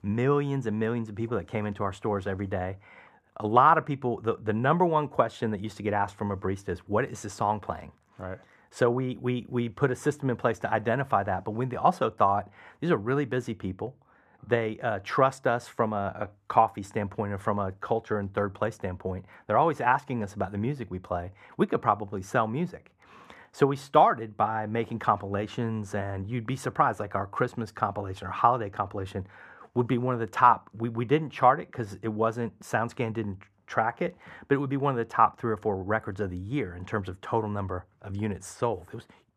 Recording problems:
muffled; slightly; fading above 3 kHz

